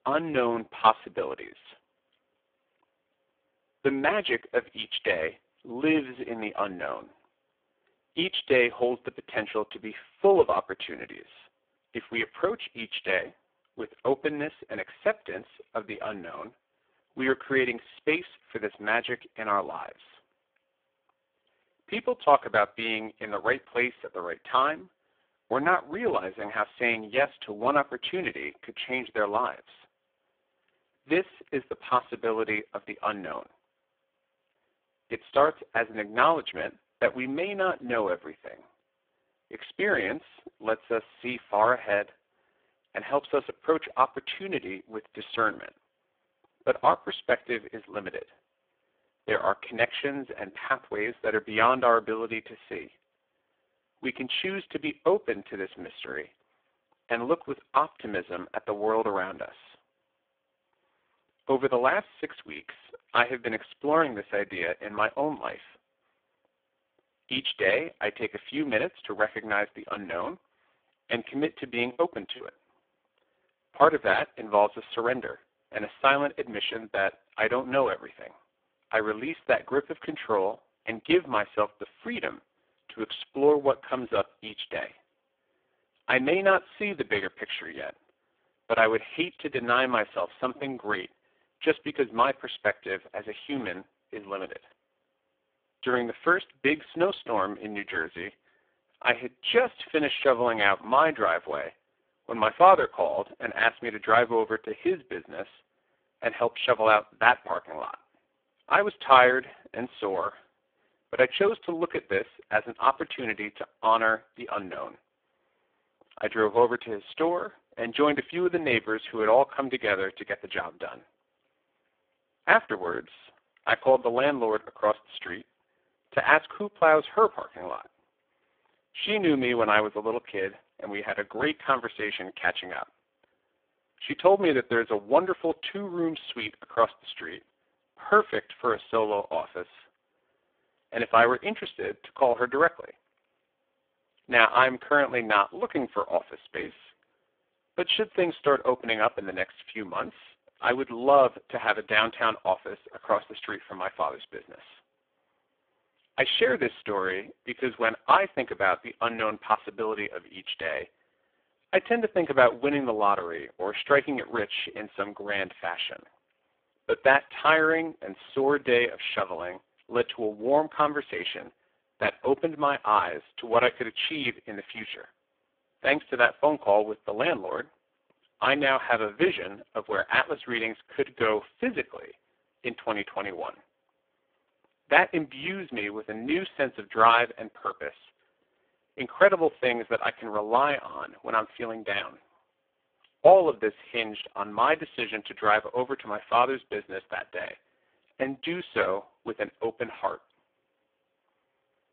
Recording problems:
phone-call audio; poor line
choppy; occasionally; at 1:12; 3% of the speech affected

